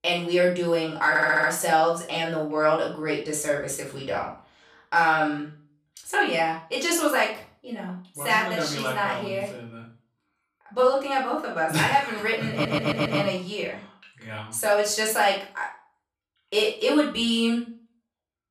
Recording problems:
off-mic speech; far
room echo; slight; dies away in 0.4 s
audio stuttering; at 1 s and at 13 s

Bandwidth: 14.5 kHz